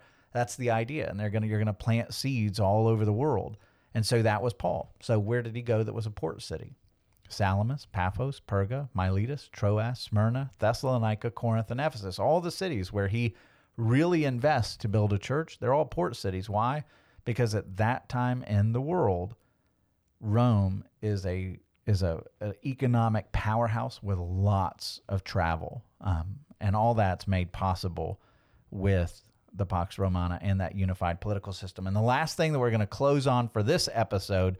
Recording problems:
none

